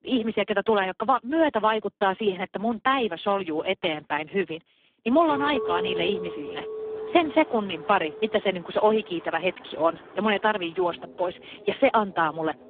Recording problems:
phone-call audio; poor line
traffic noise; faint; from 7 s on; 20 dB below the speech
clattering dishes; noticeable; from 5.5 to 9.5 s; peak 4 dB below the speech

